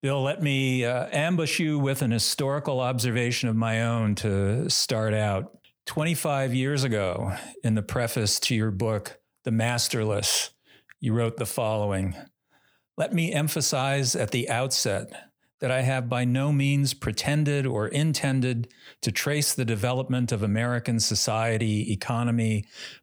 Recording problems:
none

